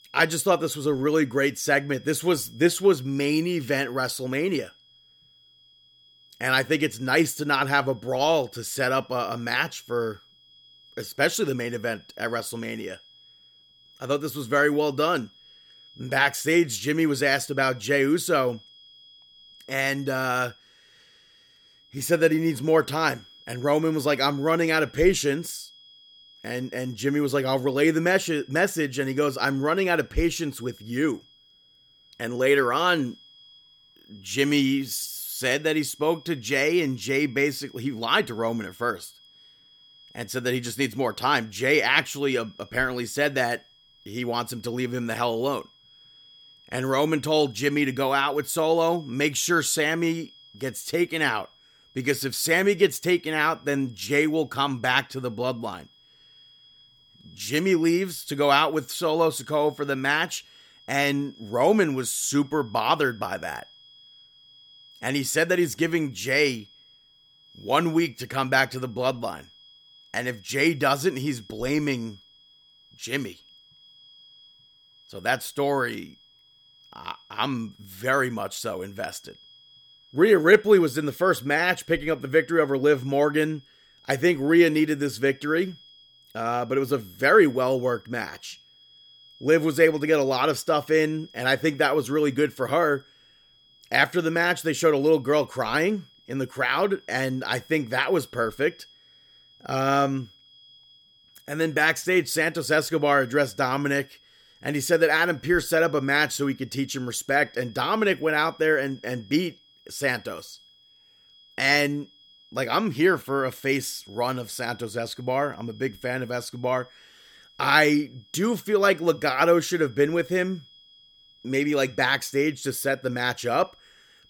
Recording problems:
high-pitched whine; faint; throughout; 3.5 kHz, 25 dB below the speech

